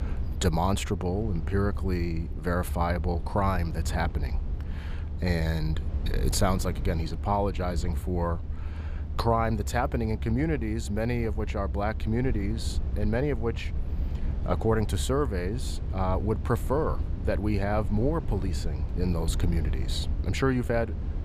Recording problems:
low rumble; noticeable; throughout; 15 dB below the speech

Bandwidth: 15 kHz